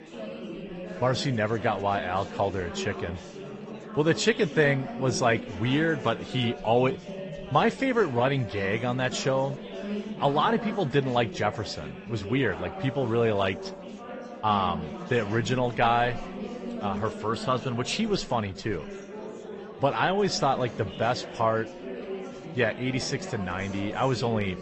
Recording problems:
garbled, watery; slightly; nothing above 8 kHz
chatter from many people; noticeable; throughout; 10 dB below the speech

